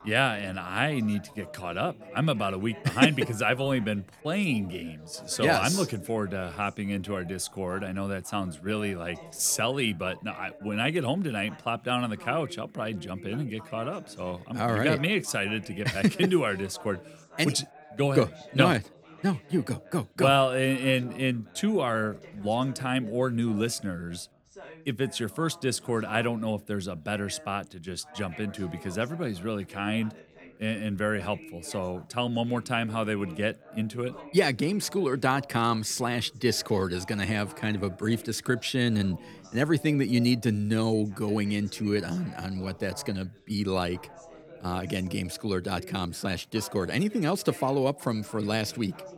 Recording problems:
background chatter; noticeable; throughout; 3 voices, 20 dB below the speech

